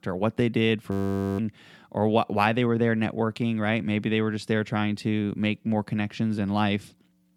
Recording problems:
audio freezing; at 1 s

